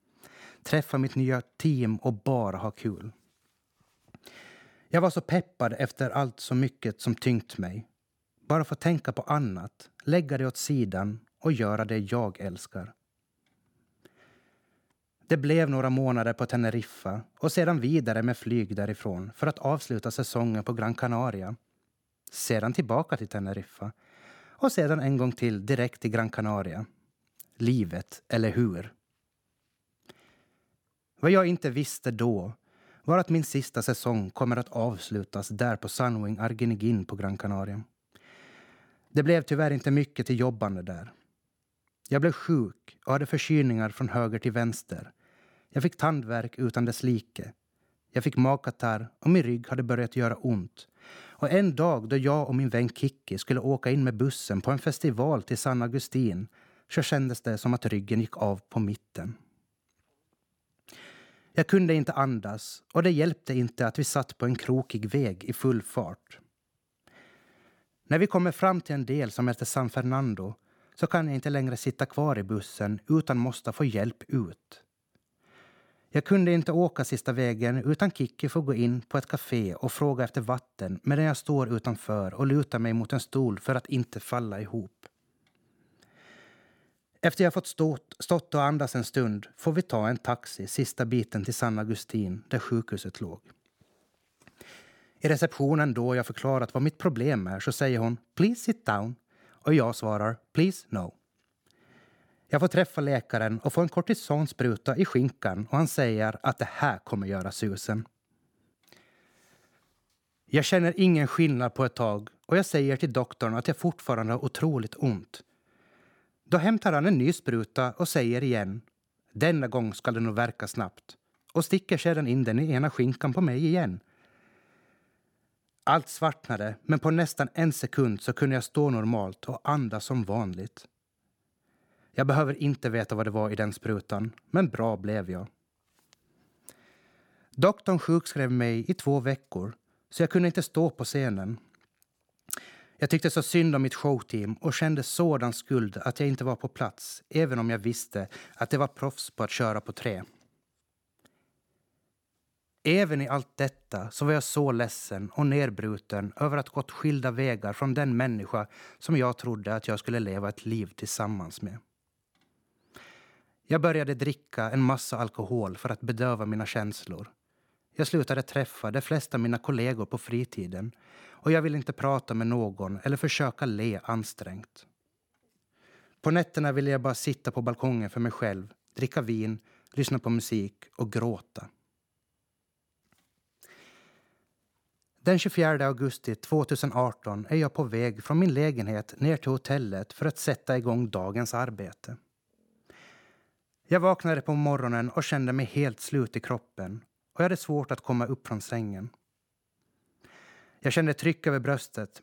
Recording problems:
none

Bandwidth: 18 kHz